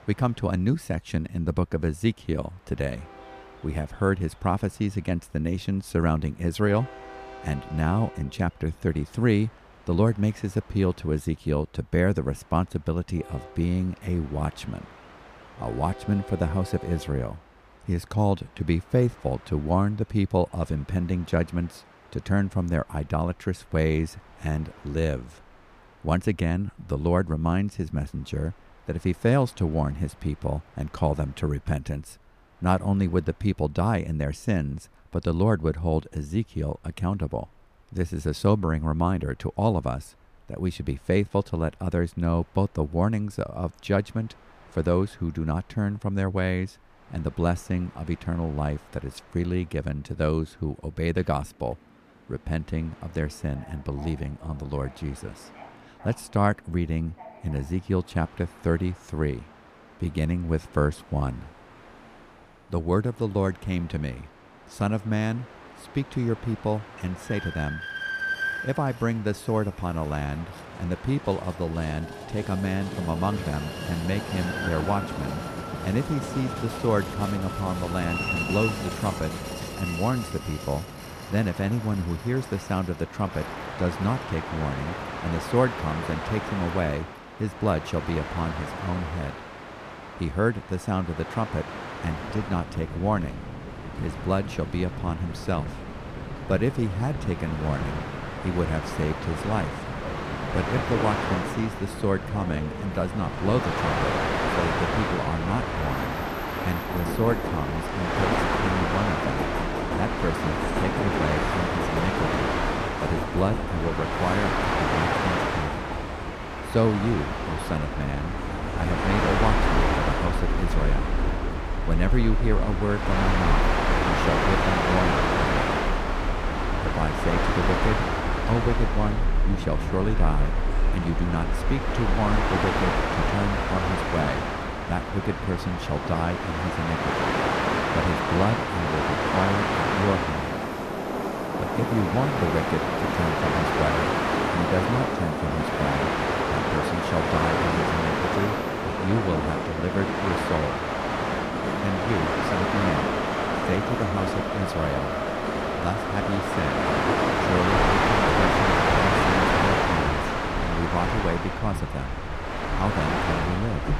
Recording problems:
train or aircraft noise; very loud; throughout; 1 dB above the speech

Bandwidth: 14.5 kHz